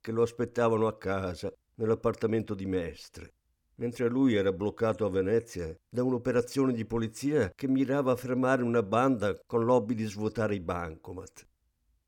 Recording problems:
none

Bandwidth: 18.5 kHz